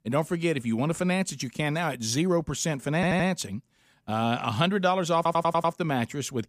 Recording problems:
audio stuttering; at 3 s and at 5 s

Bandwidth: 15 kHz